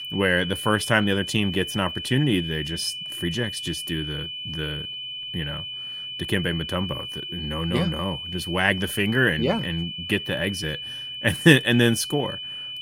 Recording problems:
high-pitched whine; loud; throughout; 3 kHz, 7 dB below the speech

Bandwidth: 16.5 kHz